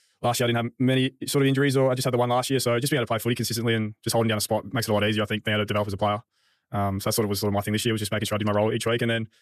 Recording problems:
wrong speed, natural pitch; too fast; 1.6 times normal speed

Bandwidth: 14.5 kHz